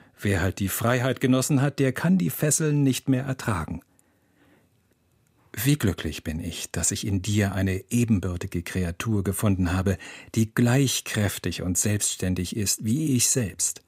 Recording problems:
none

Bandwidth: 15.5 kHz